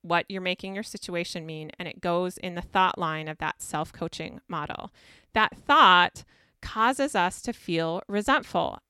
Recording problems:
none

